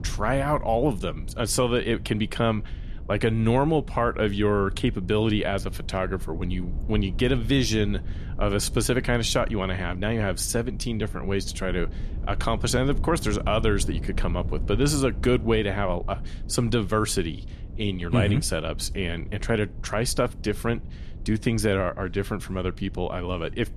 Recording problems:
low rumble; faint; throughout; 20 dB below the speech

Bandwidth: 13.5 kHz